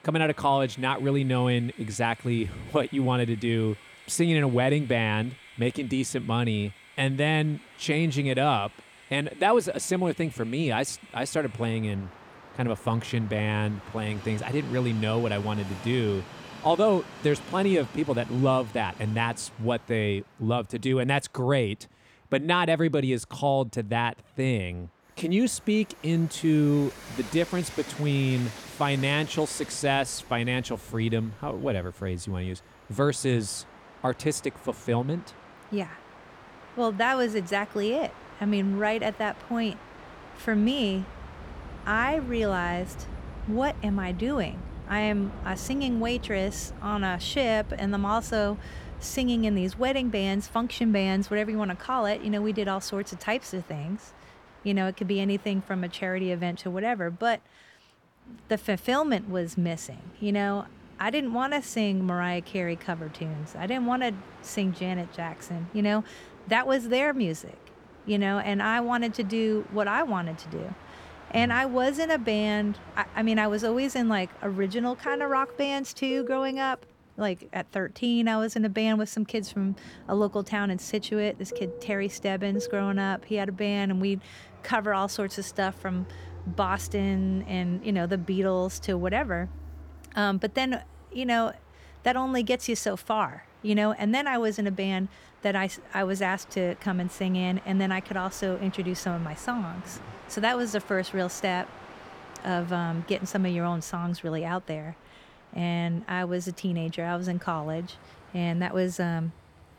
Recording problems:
train or aircraft noise; noticeable; throughout; 20 dB below the speech

